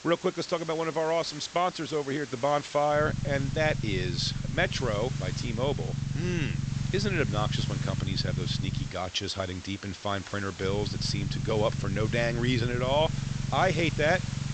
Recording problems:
high frequencies cut off; noticeable; nothing above 8 kHz
hiss; noticeable; throughout; 15 dB below the speech
low rumble; noticeable; from 3 to 9 s and from 11 s on; 15 dB below the speech

